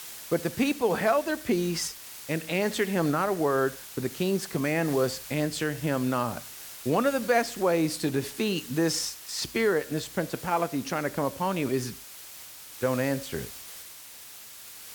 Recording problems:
hiss; noticeable; throughout; 15 dB below the speech

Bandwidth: 19 kHz